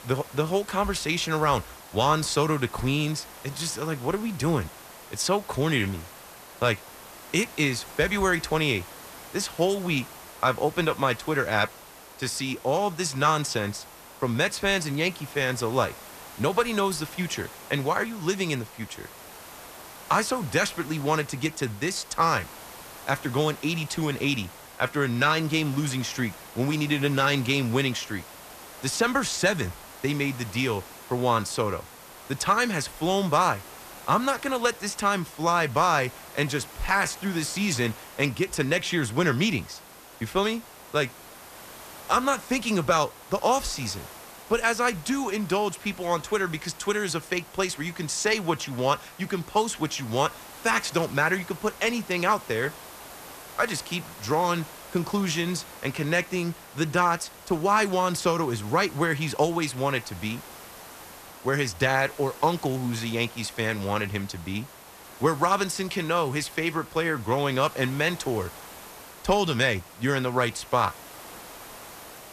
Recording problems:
hiss; noticeable; throughout; 15 dB below the speech

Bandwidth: 14.5 kHz